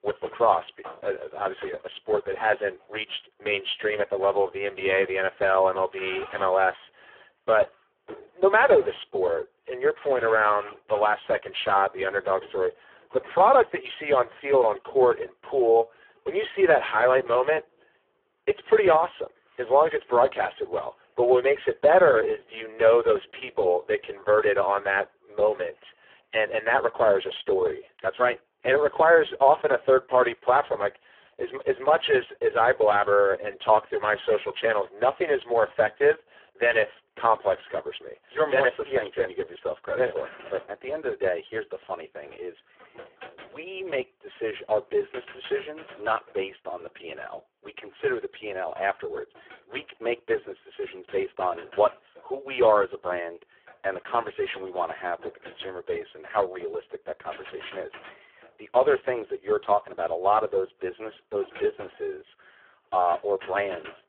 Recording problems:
phone-call audio; poor line
traffic noise; faint; throughout; 20 dB below the speech

